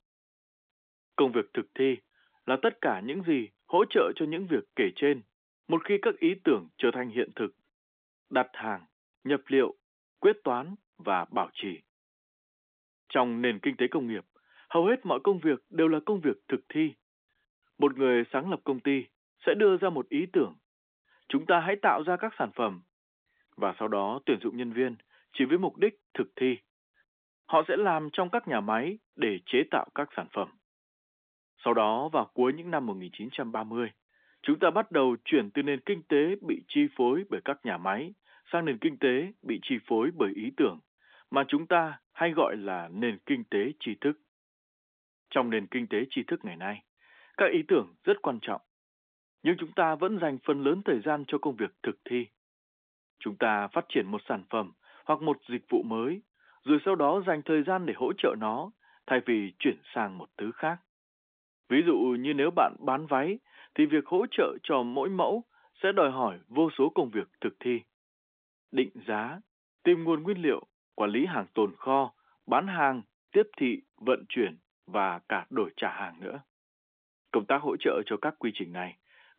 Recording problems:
phone-call audio; nothing above 3.5 kHz

